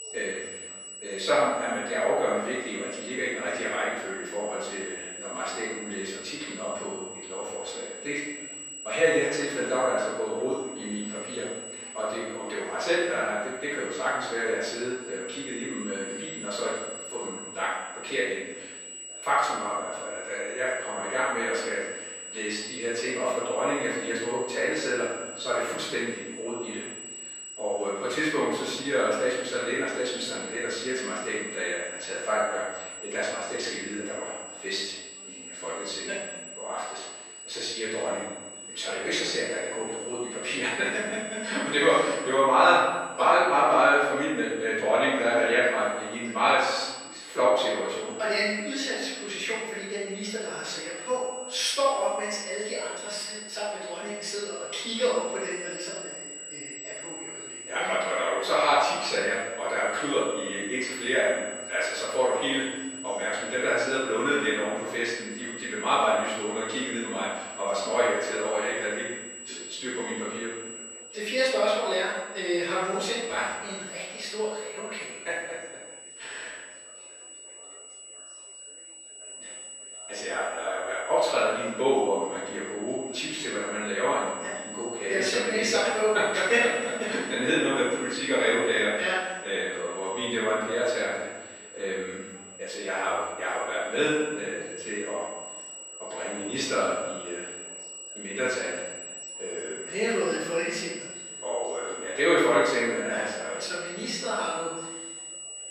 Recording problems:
room echo; strong; dies away in 1.1 s
off-mic speech; far
thin; somewhat; fading below 450 Hz
high-pitched whine; noticeable; throughout; 8 kHz, 10 dB below the speech
chatter from many people; faint; throughout; 25 dB below the speech

